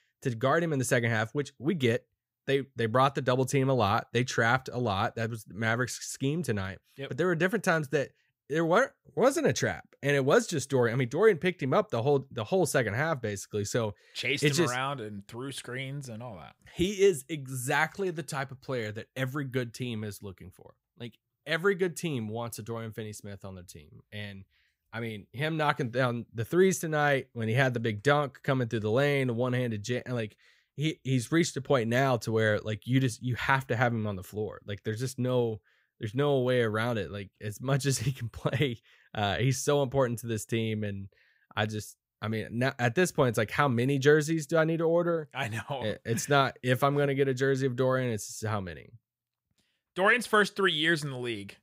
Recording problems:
none

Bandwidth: 15.5 kHz